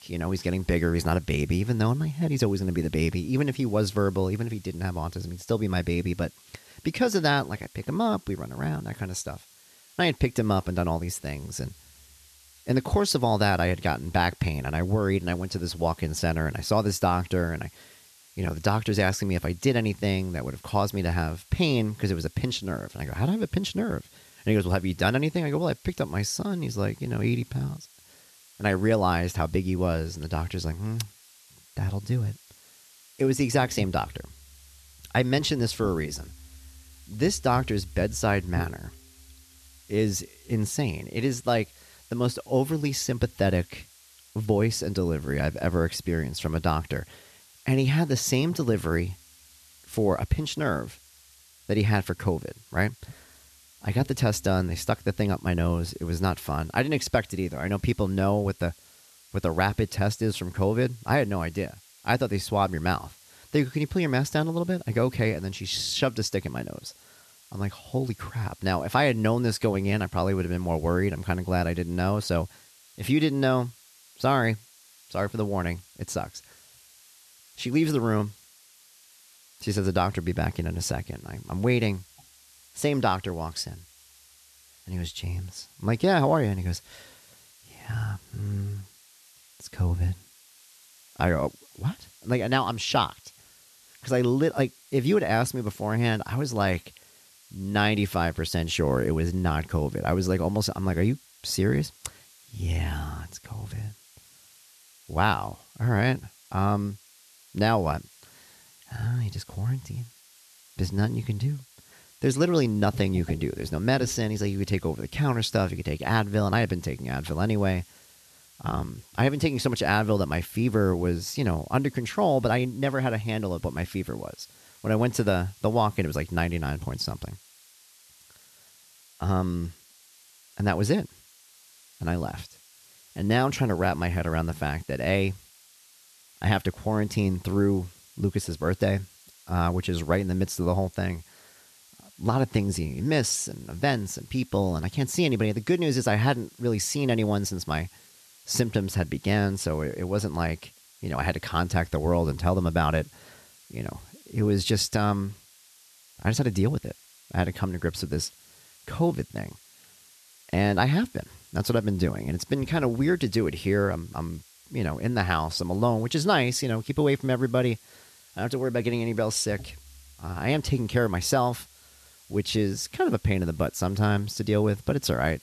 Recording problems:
hiss; faint; throughout; 25 dB below the speech

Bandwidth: 13.5 kHz